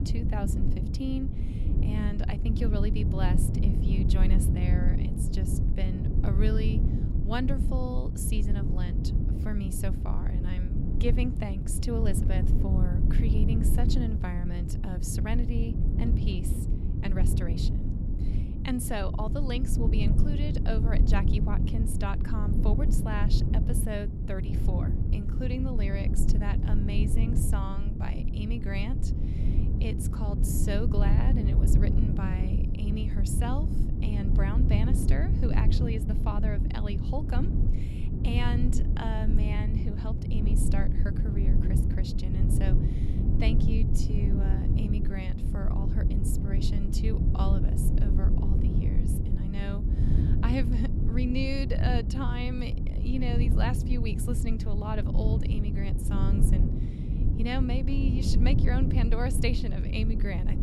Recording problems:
low rumble; loud; throughout; 2 dB below the speech

